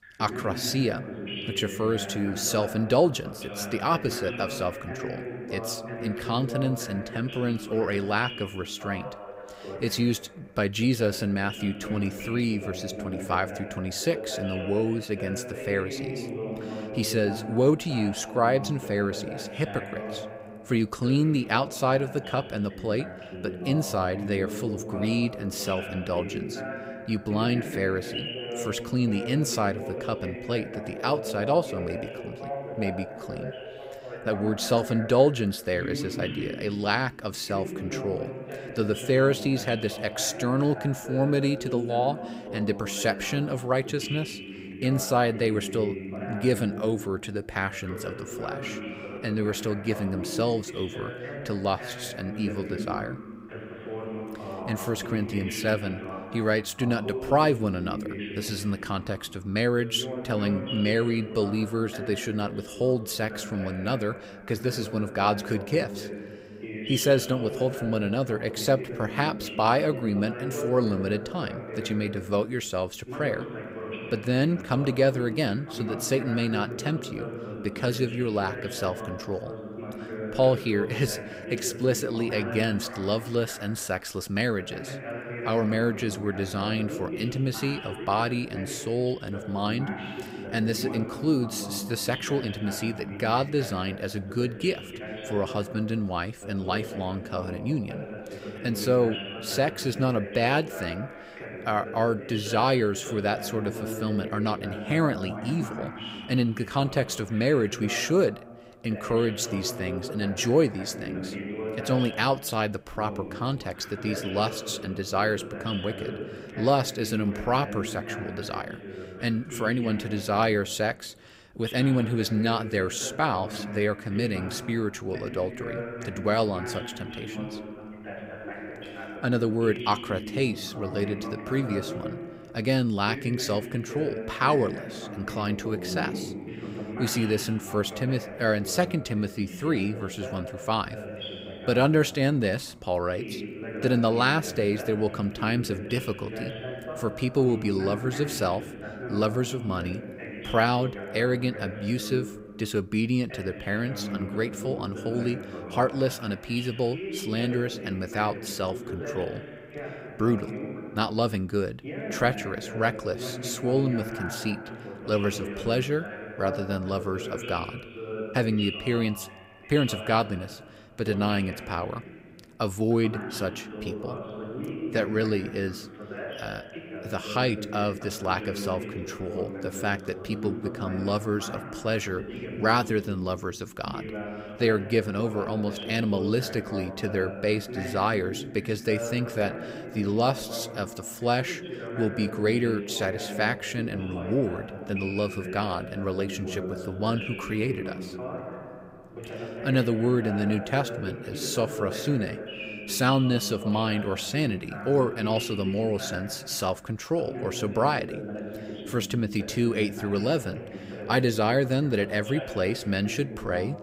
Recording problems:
voice in the background; loud; throughout; 9 dB below the speech

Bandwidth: 15.5 kHz